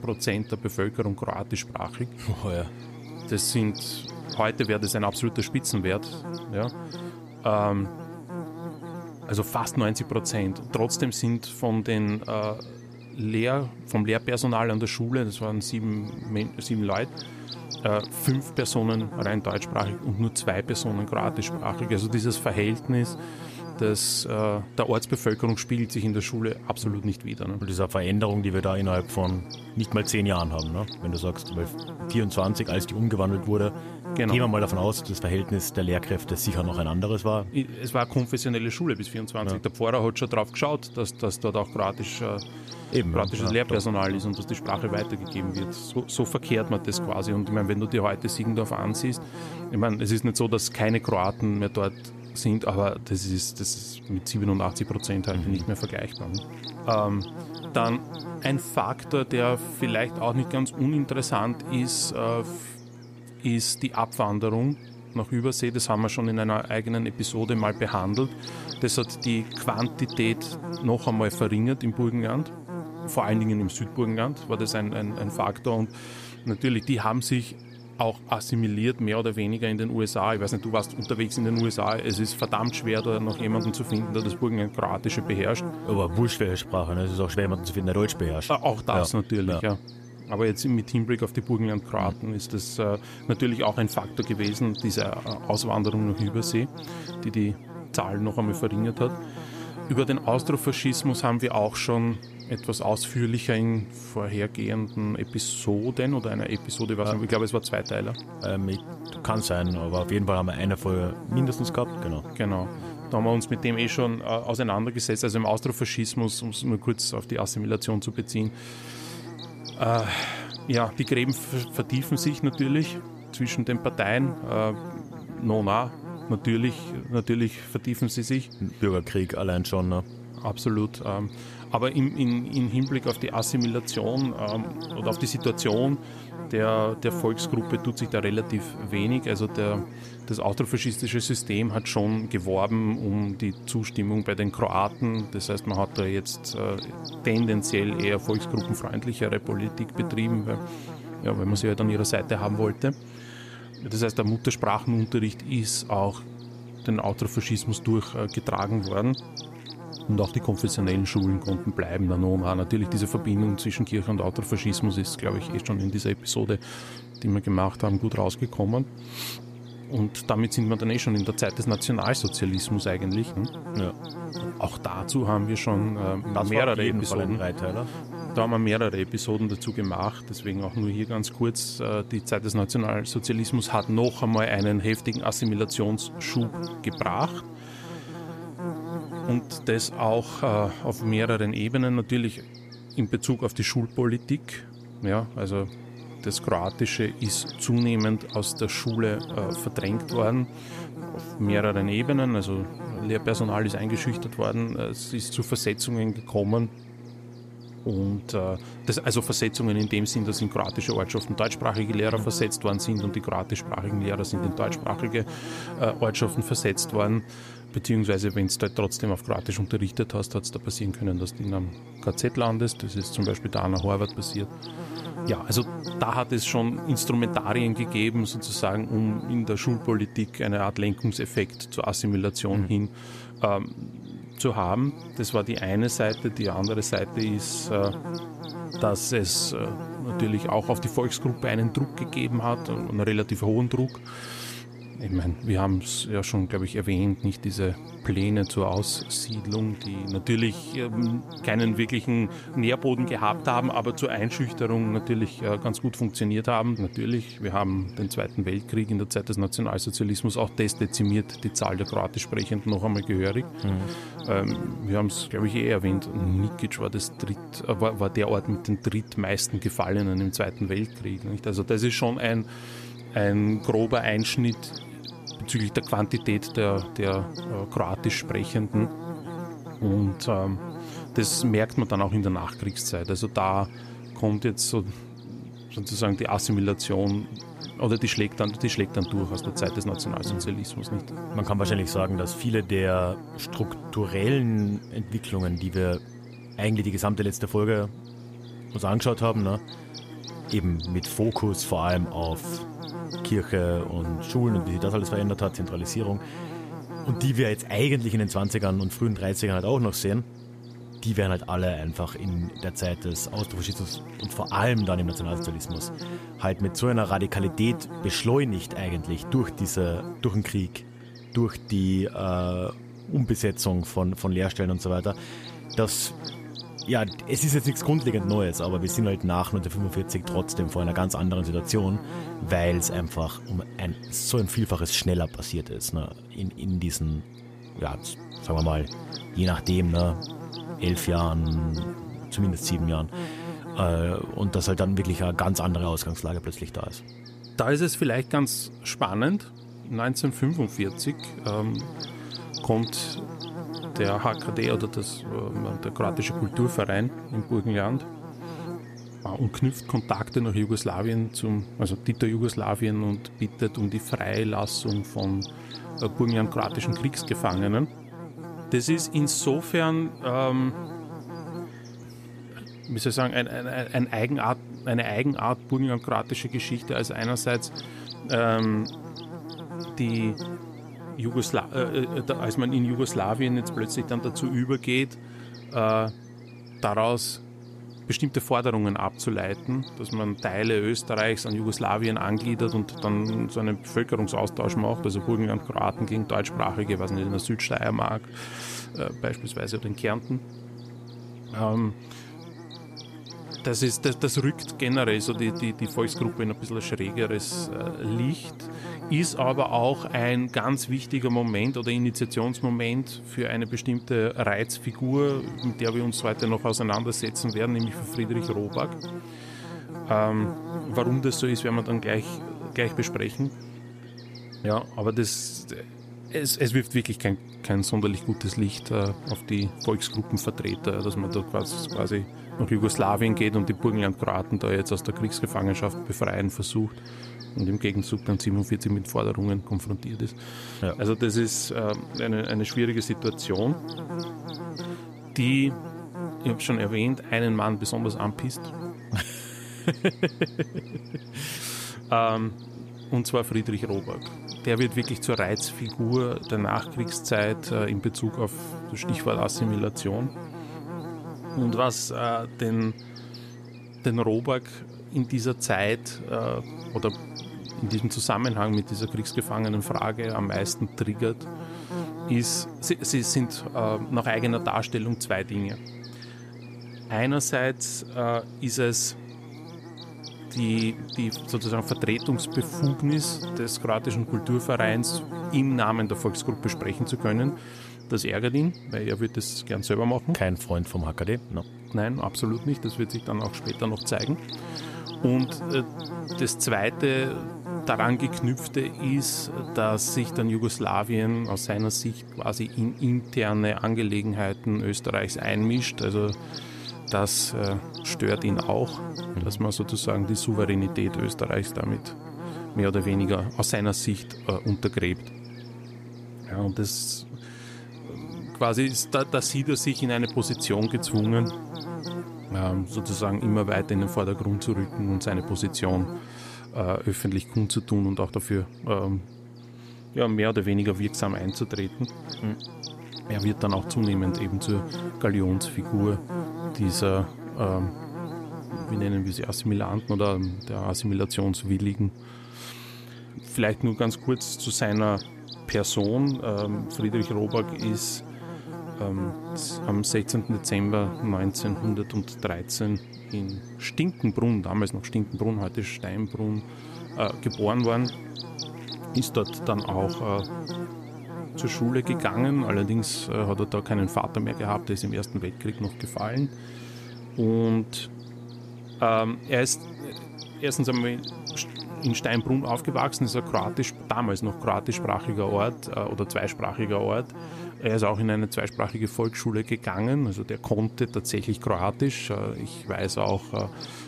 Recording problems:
electrical hum; noticeable; throughout; 60 Hz, 10 dB below the speech

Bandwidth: 14.5 kHz